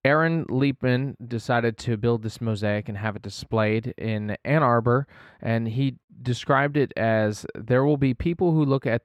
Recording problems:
muffled; slightly; fading above 3.5 kHz

